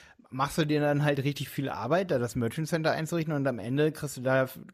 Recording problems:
none

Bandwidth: 14.5 kHz